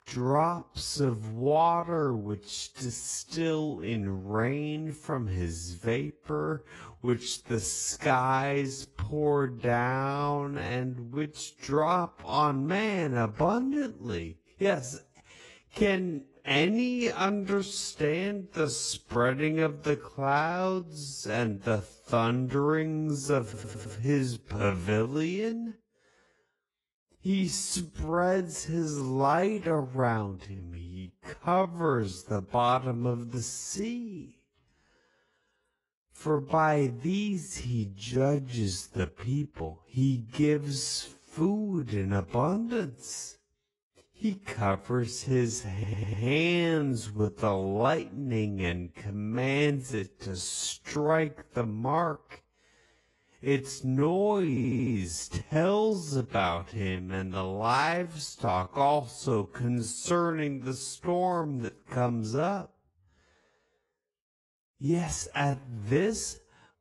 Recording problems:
wrong speed, natural pitch; too slow; 0.5 times normal speed
garbled, watery; slightly; nothing above 10.5 kHz
audio stuttering; at 23 s, at 46 s and at 55 s

